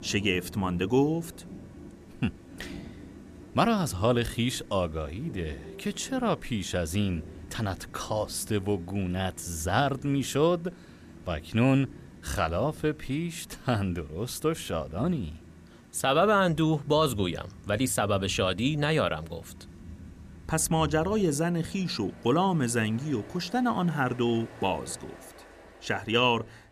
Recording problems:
rain or running water; noticeable; throughout; 20 dB below the speech

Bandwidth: 14.5 kHz